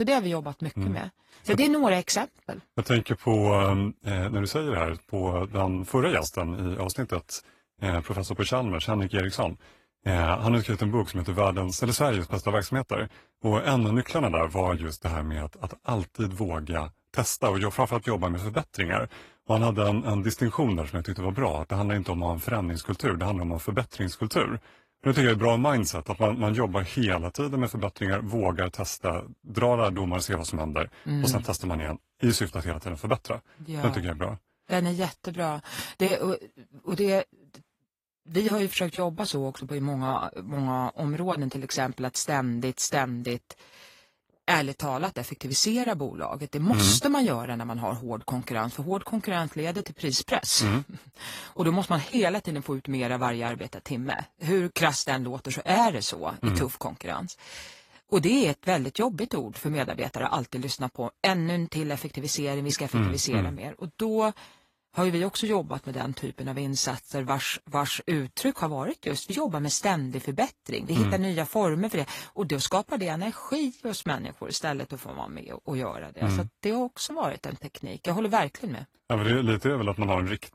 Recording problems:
garbled, watery; slightly; nothing above 14.5 kHz
abrupt cut into speech; at the start

